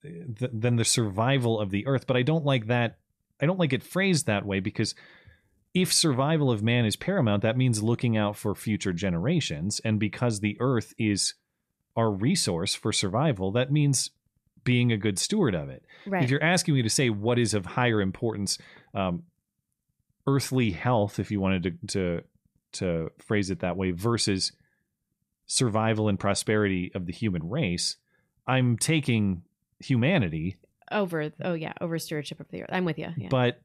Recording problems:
none

